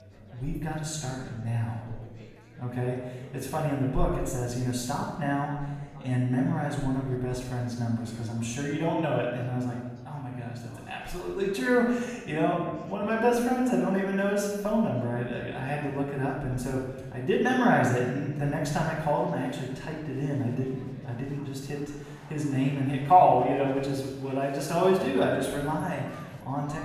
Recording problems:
off-mic speech; far
room echo; noticeable; dies away in 1.1 s
chatter from many people; faint; throughout; 20 dB below the speech

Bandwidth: 14.5 kHz